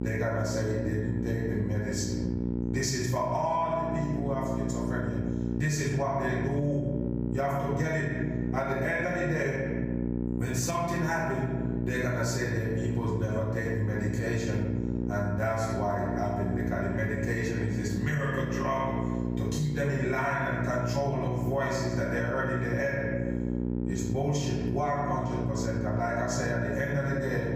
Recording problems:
off-mic speech; far
room echo; noticeable; dies away in 1 s
squashed, flat; somewhat
electrical hum; loud; throughout; 60 Hz, 8 dB below the speech

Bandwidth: 15 kHz